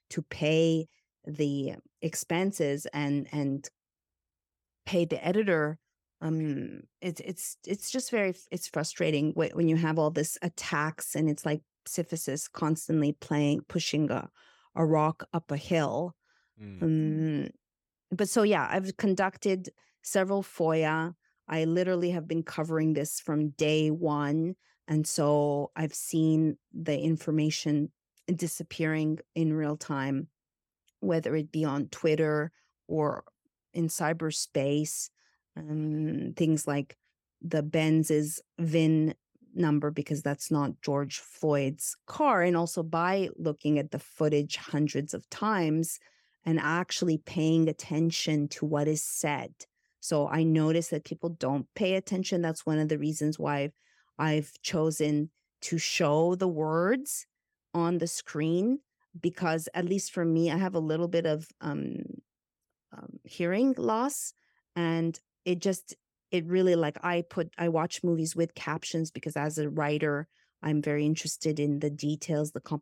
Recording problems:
none

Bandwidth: 17 kHz